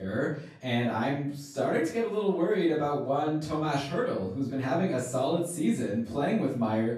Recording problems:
off-mic speech; far
room echo; noticeable; dies away in 0.4 s
abrupt cut into speech; at the start

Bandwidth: 13.5 kHz